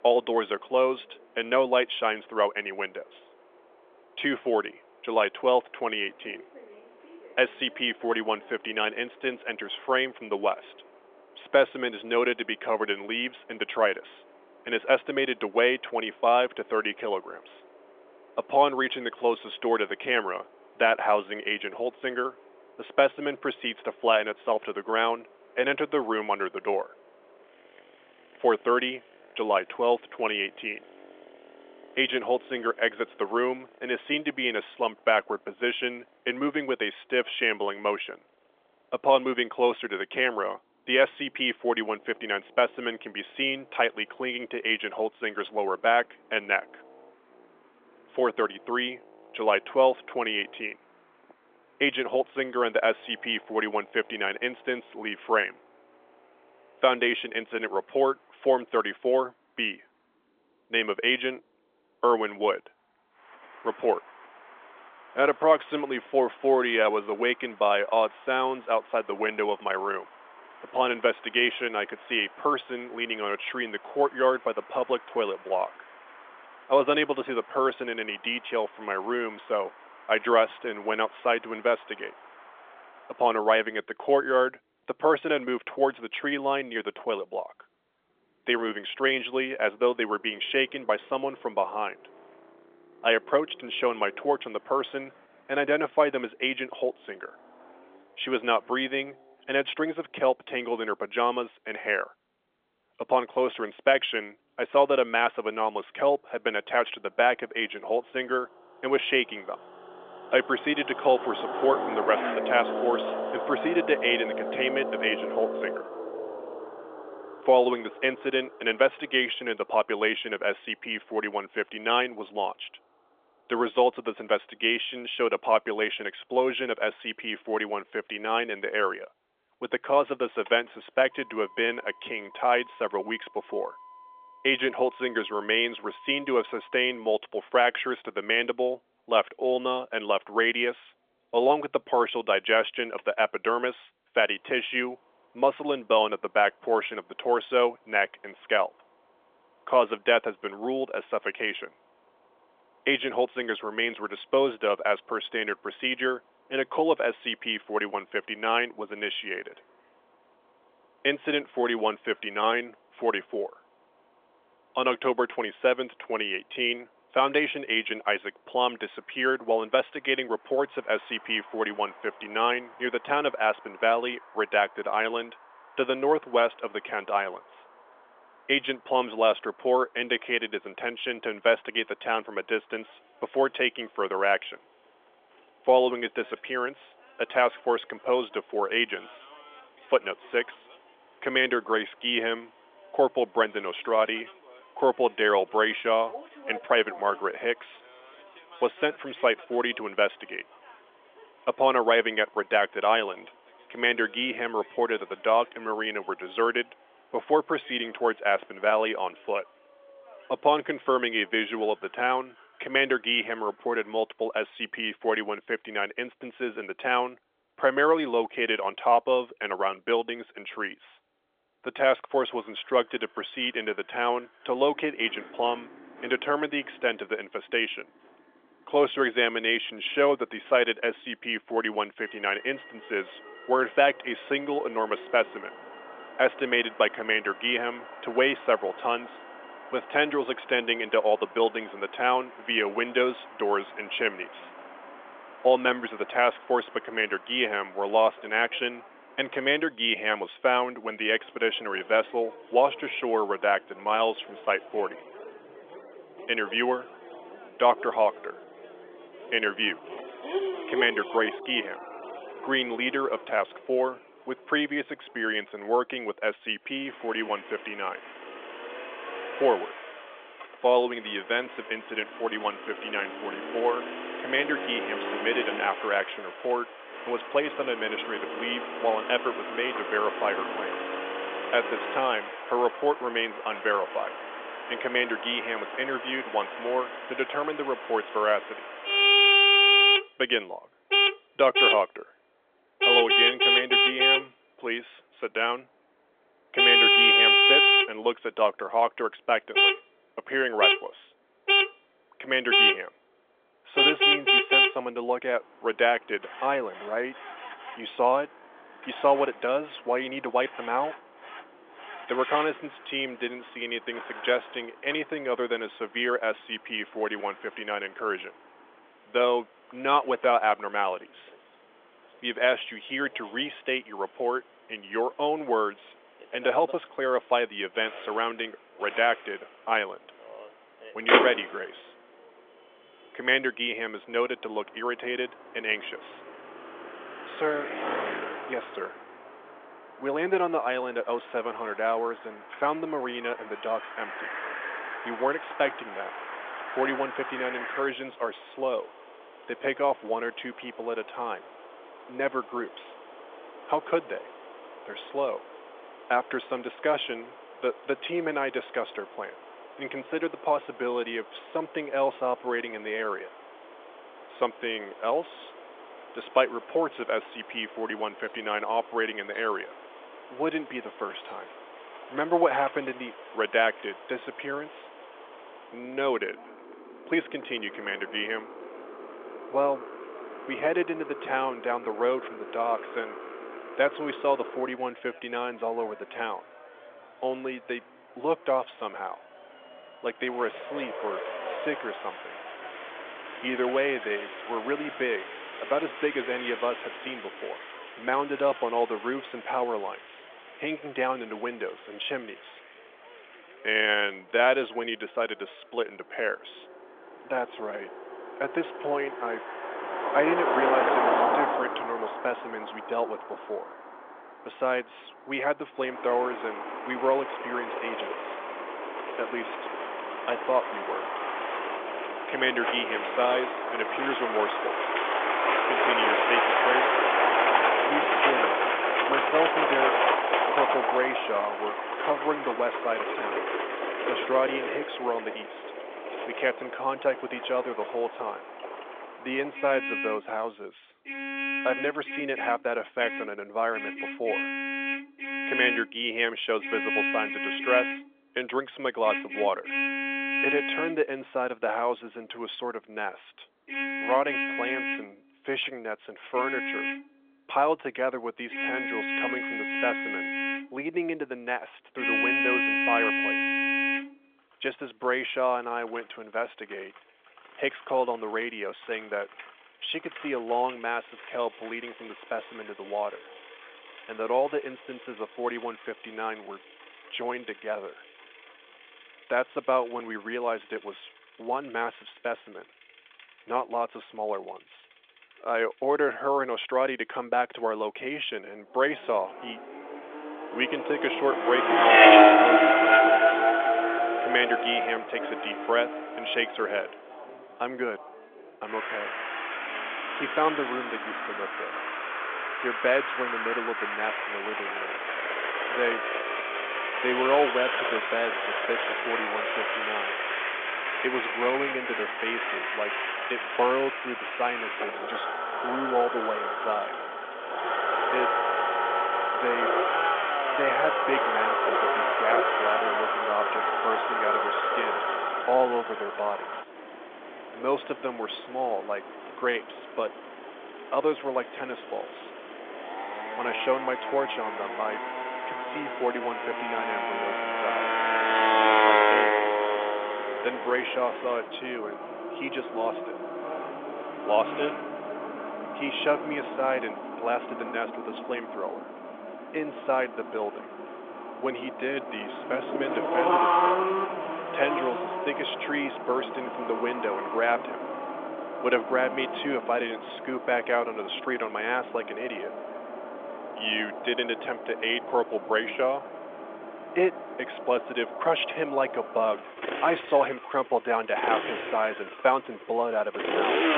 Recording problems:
phone-call audio; nothing above 3.5 kHz
traffic noise; very loud; throughout; 1 dB above the speech

